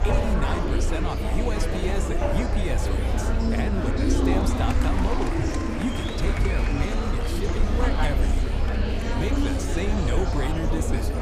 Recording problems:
murmuring crowd; very loud; throughout; 3 dB above the speech
machinery noise; loud; throughout; 7 dB below the speech
low rumble; noticeable; throughout; 15 dB below the speech

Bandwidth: 15 kHz